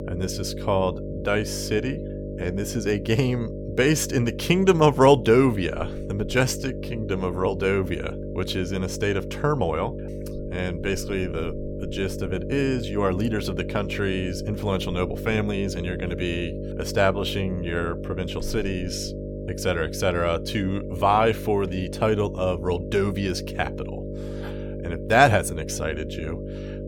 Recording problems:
electrical hum; noticeable; throughout; 50 Hz, 10 dB below the speech

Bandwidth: 17 kHz